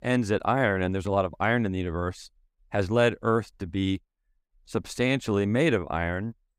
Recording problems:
none

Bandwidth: 15.5 kHz